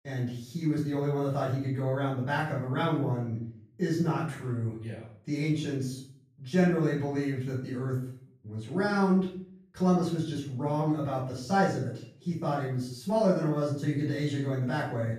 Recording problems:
off-mic speech; far
room echo; noticeable; dies away in 0.5 s

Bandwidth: 14.5 kHz